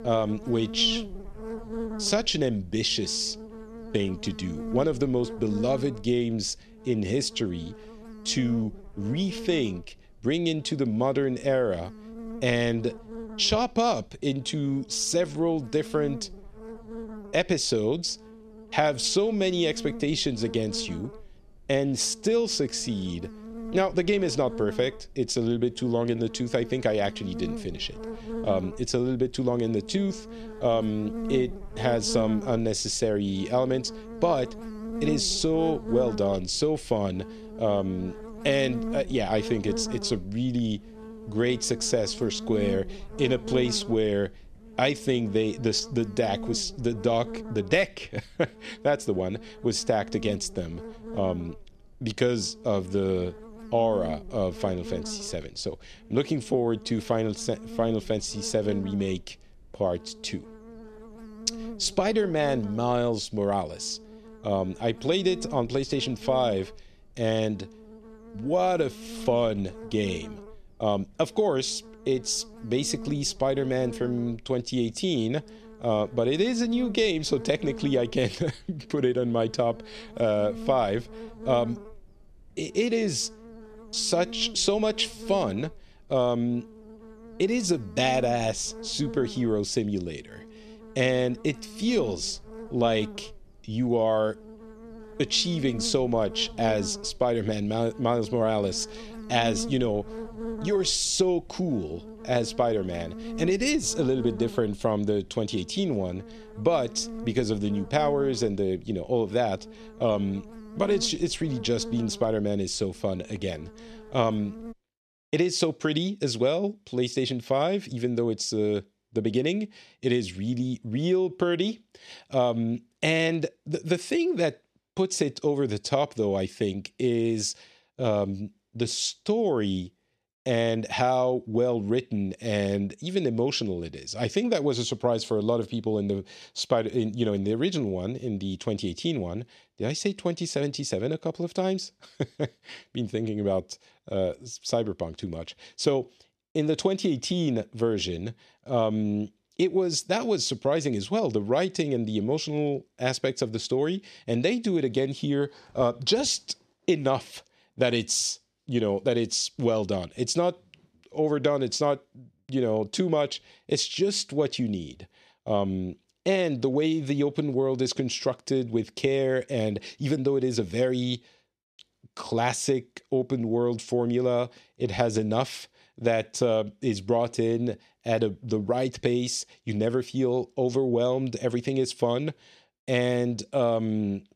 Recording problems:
electrical hum; noticeable; until 1:55; 60 Hz, 15 dB below the speech

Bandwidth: 13.5 kHz